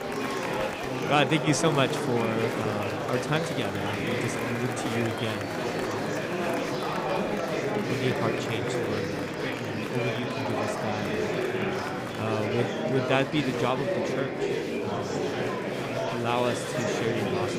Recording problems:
murmuring crowd; very loud; throughout; 1 dB above the speech

